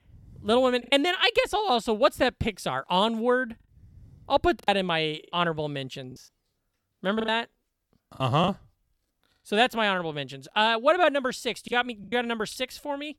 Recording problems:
choppy; very; 5% of the speech affected

